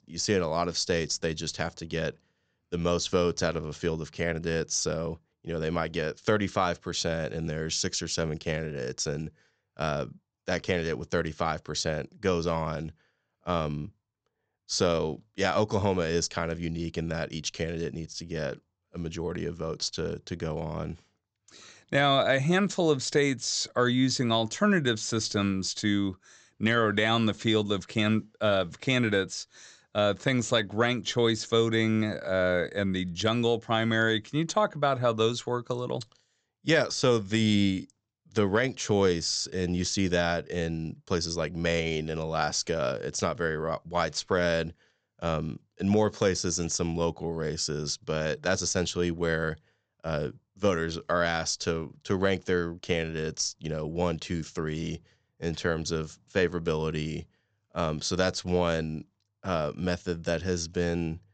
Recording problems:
high frequencies cut off; noticeable; nothing above 8 kHz

